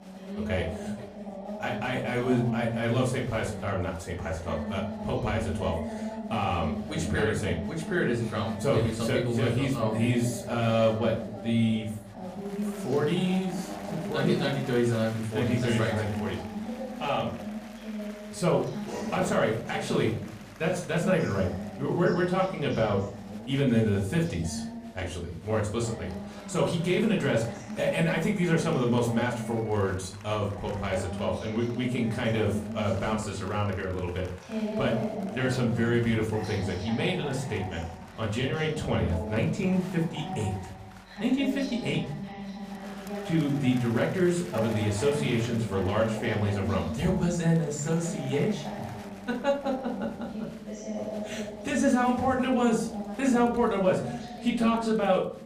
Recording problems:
off-mic speech; far
room echo; slight; dies away in 0.4 s
voice in the background; loud; throughout; 9 dB below the speech
crowd noise; faint; throughout; 20 dB below the speech

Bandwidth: 14.5 kHz